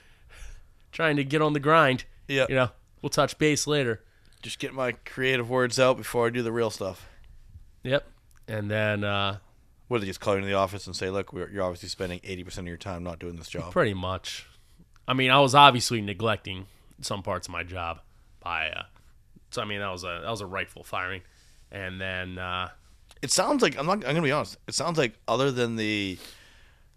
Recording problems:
none

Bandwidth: 14 kHz